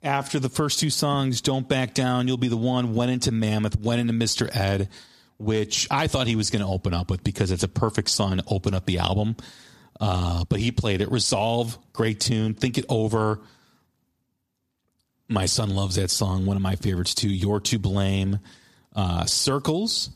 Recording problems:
squashed, flat; somewhat

